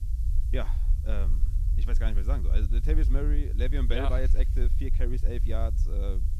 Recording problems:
low rumble; noticeable; throughout; 10 dB below the speech
hiss; faint; throughout; 20 dB below the speech

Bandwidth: 14.5 kHz